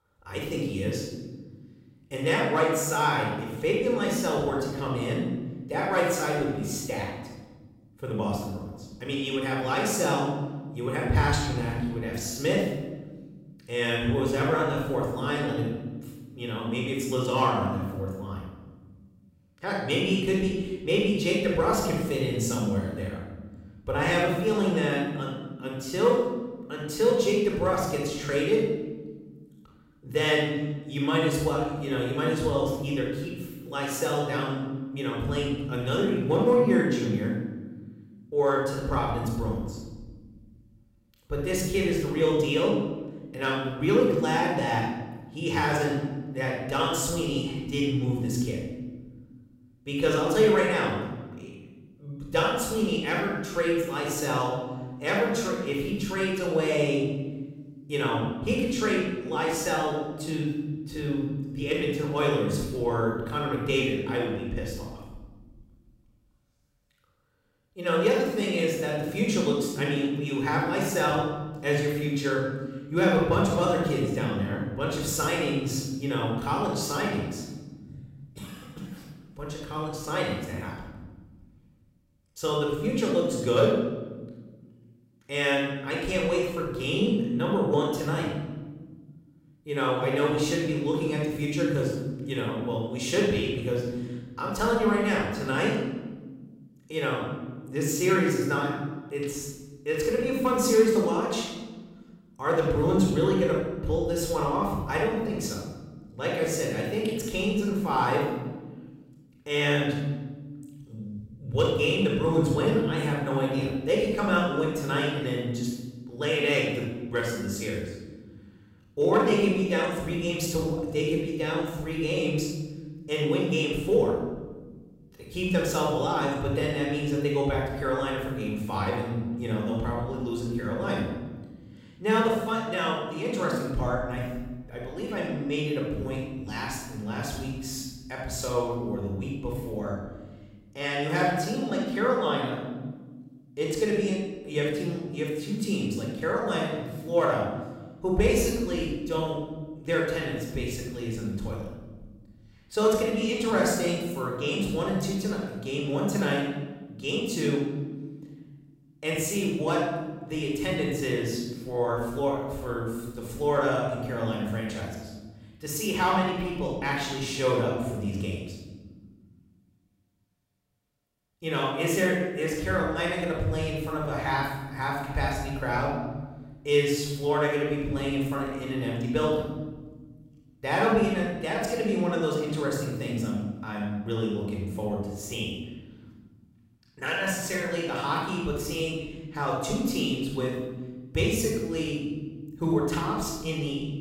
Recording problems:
room echo; strong; dies away in 1.4 s
off-mic speech; far

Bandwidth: 16 kHz